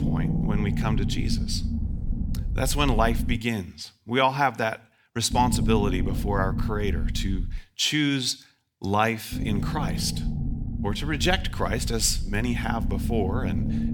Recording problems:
low rumble; noticeable; until 3.5 s, from 5.5 to 7.5 s and from 9.5 s on; 10 dB below the speech

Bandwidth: 18.5 kHz